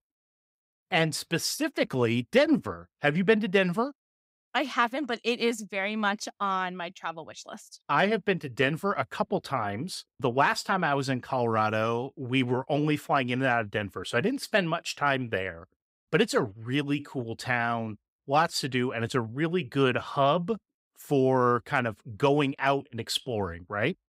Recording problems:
none

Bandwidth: 15.5 kHz